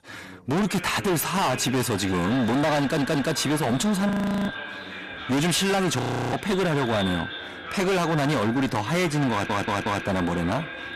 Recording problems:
distortion; heavy; 31% of the sound clipped
echo of what is said; noticeable; throughout; 460 ms later, 10 dB below the speech
background chatter; noticeable; throughout; 3 voices, 15 dB below the speech
audio stuttering; at 3 s and at 9.5 s
audio freezing; at 4 s and at 6 s

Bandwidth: 14 kHz